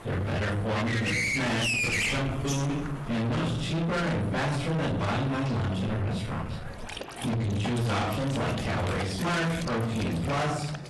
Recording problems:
distortion; heavy; 6 dB below the speech
off-mic speech; far
room echo; noticeable; dies away in 0.5 s
garbled, watery; slightly; nothing above 11.5 kHz
animal sounds; loud; throughout; 3 dB below the speech
murmuring crowd; noticeable; throughout; 20 dB below the speech

